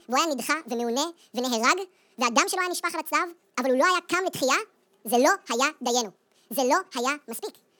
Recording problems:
wrong speed and pitch; too fast and too high; 1.7 times normal speed

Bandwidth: 19 kHz